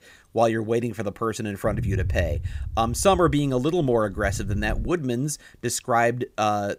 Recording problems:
low rumble; faint; from 1.5 to 5 s; 20 dB below the speech

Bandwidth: 15.5 kHz